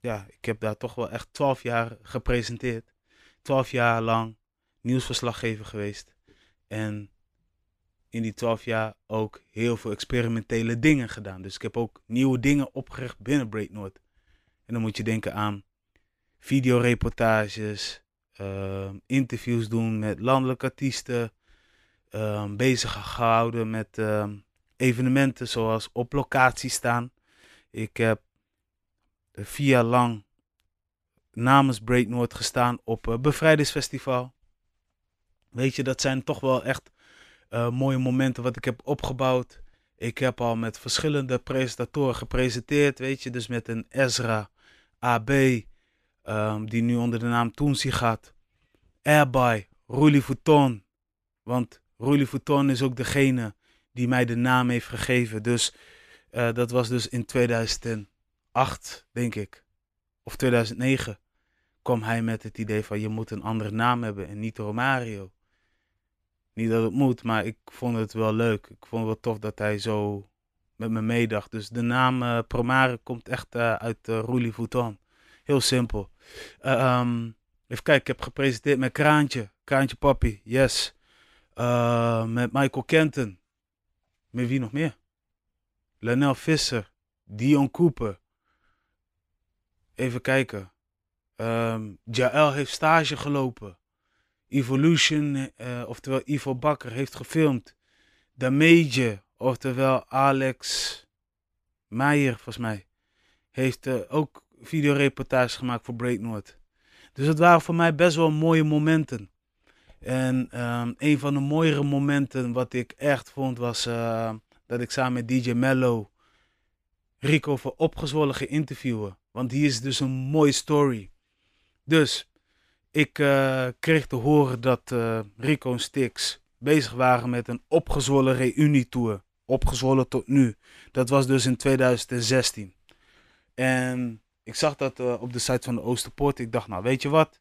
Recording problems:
none

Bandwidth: 14.5 kHz